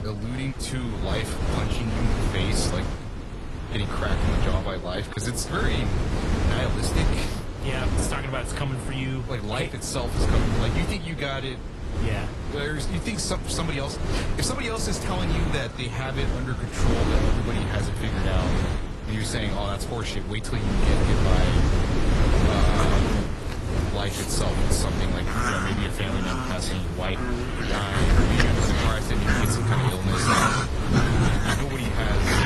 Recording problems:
garbled, watery; slightly; nothing above 11.5 kHz
animal sounds; very loud; throughout; 2 dB above the speech
wind noise on the microphone; heavy; 1 dB below the speech

